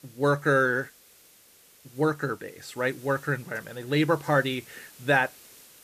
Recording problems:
hiss; faint; throughout; 25 dB below the speech

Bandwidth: 14.5 kHz